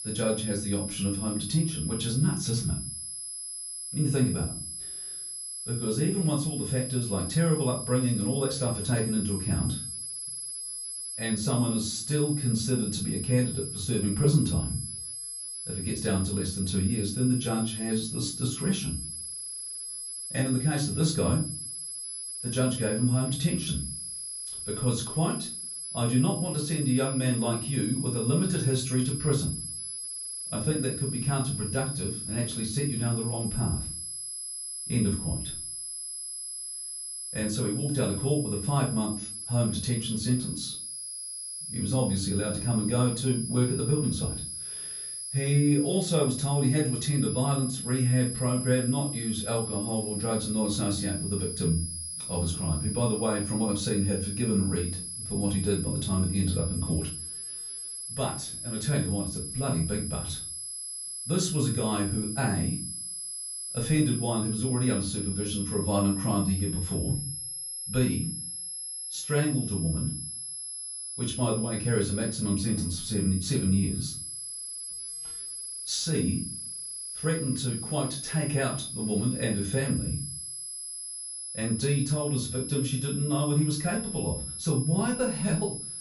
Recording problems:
off-mic speech; far
room echo; slight; dies away in 0.4 s
high-pitched whine; loud; throughout; 11 kHz, 5 dB below the speech

